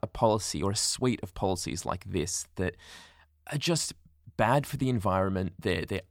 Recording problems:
none

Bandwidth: 19 kHz